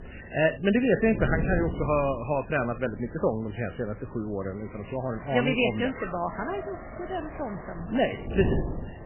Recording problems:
garbled, watery; badly; nothing above 3 kHz
traffic noise; noticeable; throughout; 20 dB below the speech
wind noise on the microphone; occasional gusts; 15 dB below the speech
train or aircraft noise; faint; from 3 s on; 20 dB below the speech

